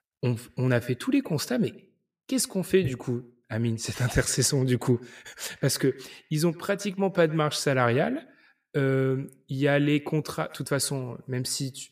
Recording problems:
echo of what is said; faint; throughout; 110 ms later, 20 dB below the speech

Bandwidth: 15 kHz